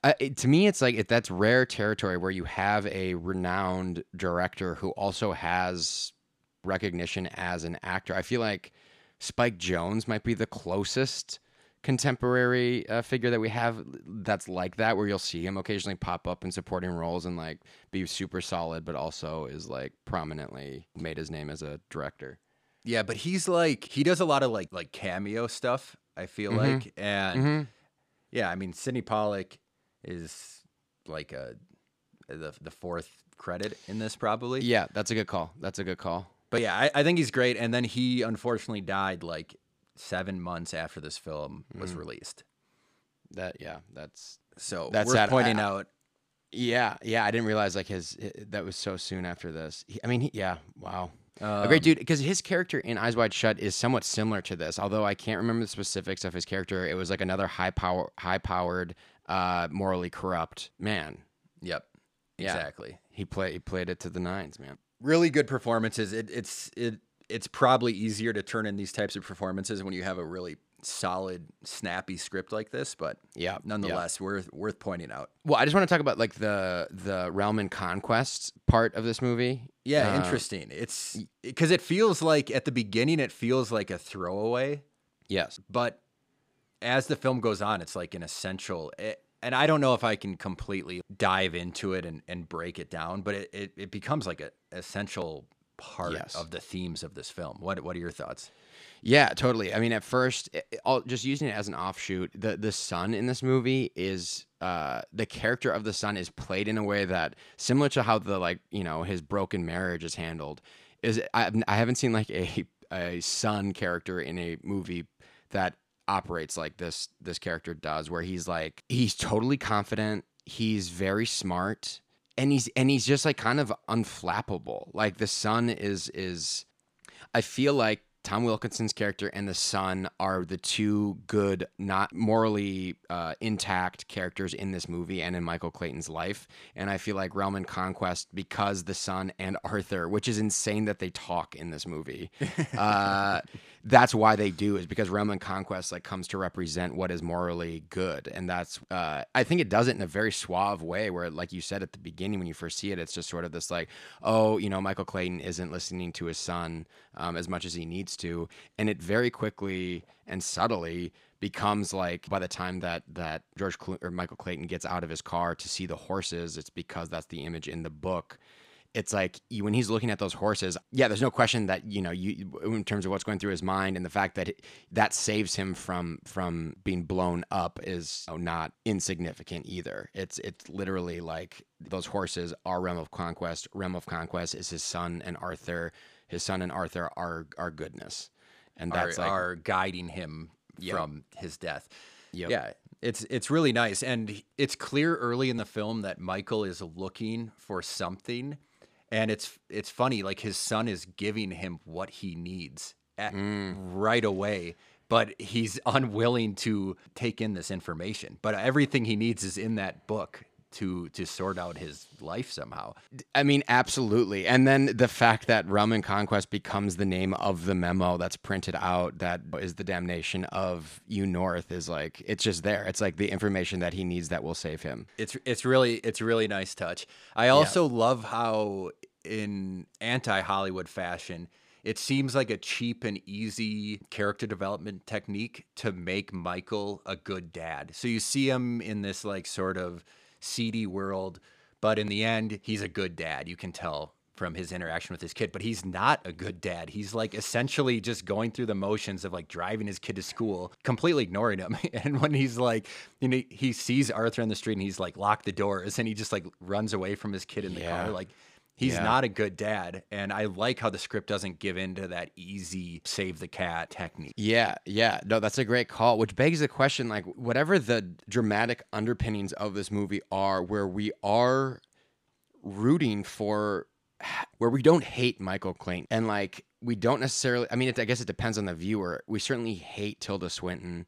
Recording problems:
none

